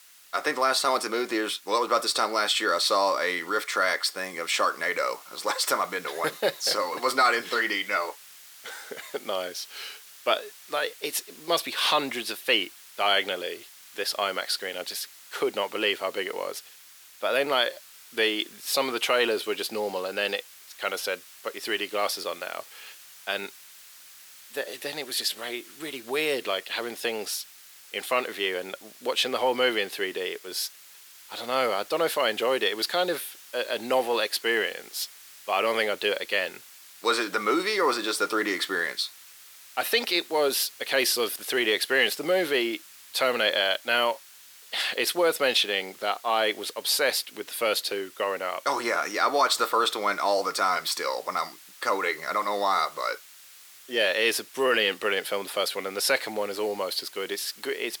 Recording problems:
thin; somewhat; fading below 350 Hz
hiss; faint; throughout; 20 dB below the speech

